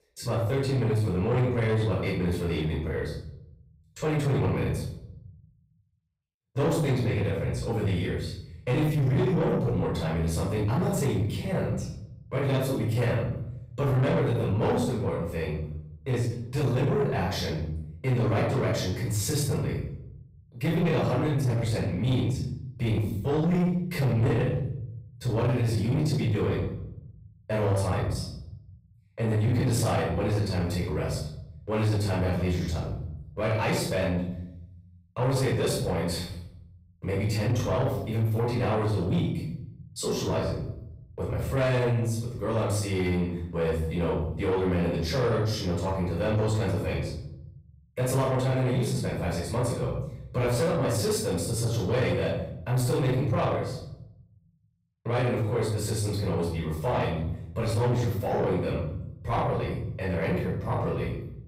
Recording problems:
off-mic speech; far
room echo; noticeable; dies away in 0.8 s
distortion; slight; 10 dB below the speech

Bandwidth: 15.5 kHz